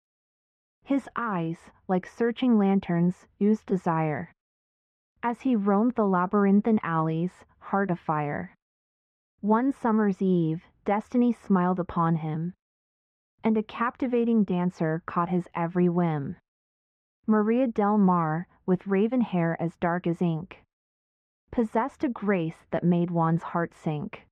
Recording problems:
muffled; very; fading above 1.5 kHz

